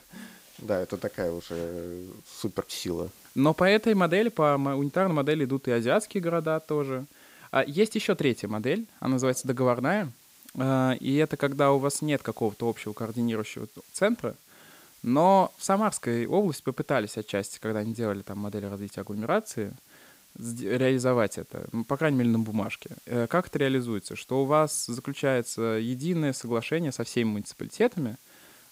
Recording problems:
hiss; faint; throughout; 25 dB below the speech

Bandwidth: 15.5 kHz